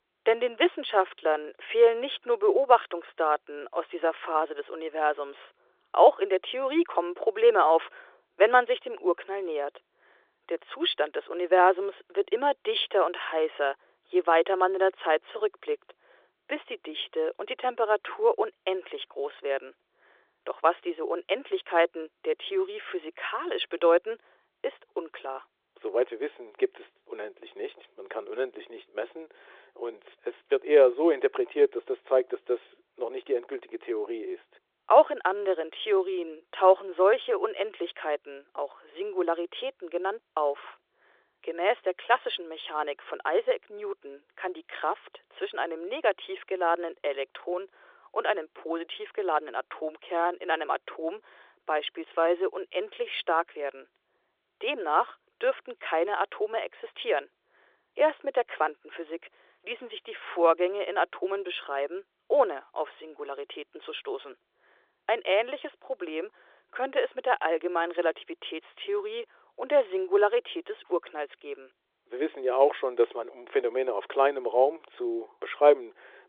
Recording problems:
phone-call audio; nothing above 3.5 kHz

